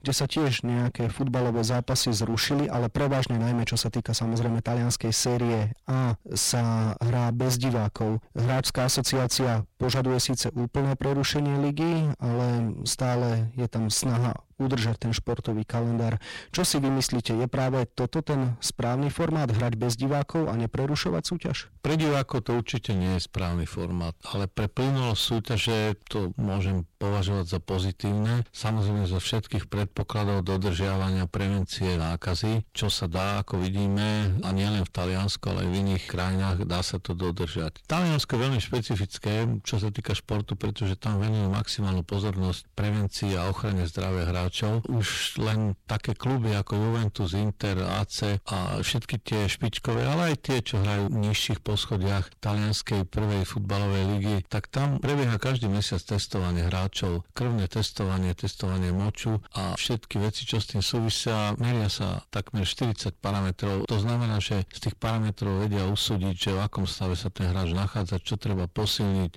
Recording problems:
distortion; heavy; 23% of the sound clipped

